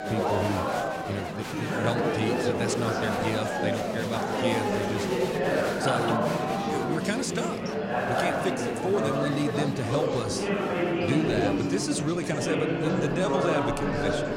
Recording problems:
murmuring crowd; very loud; throughout; 4 dB above the speech

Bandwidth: 16 kHz